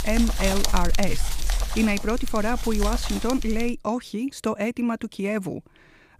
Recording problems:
wind noise on the microphone; heavy; until 3.5 s; 4 dB below the speech

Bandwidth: 15 kHz